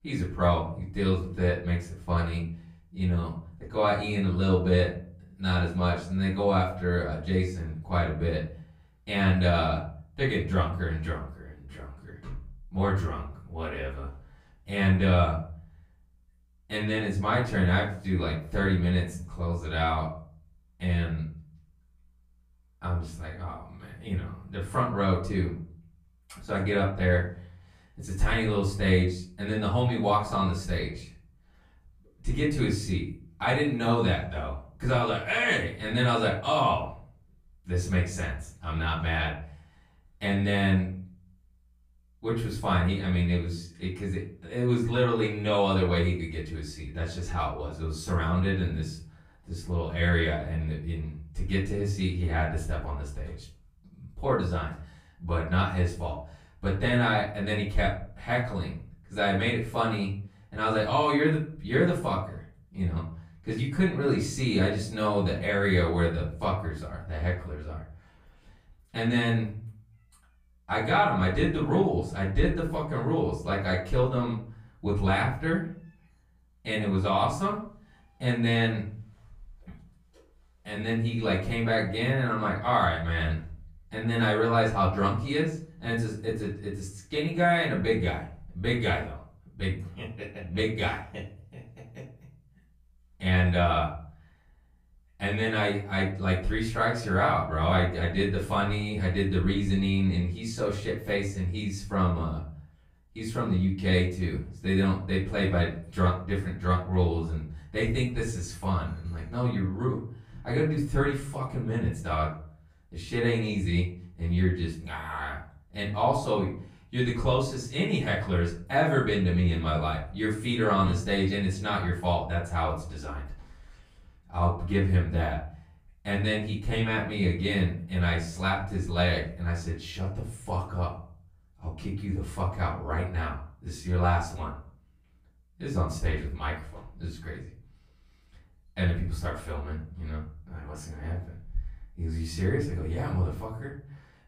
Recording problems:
off-mic speech; far
room echo; noticeable; dies away in 0.4 s

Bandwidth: 15.5 kHz